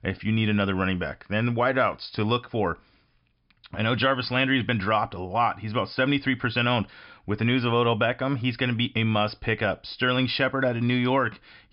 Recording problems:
high frequencies cut off; noticeable; nothing above 5.5 kHz

